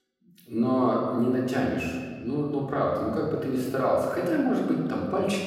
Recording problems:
off-mic speech; far
room echo; noticeable; dies away in 1.6 s

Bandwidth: 16 kHz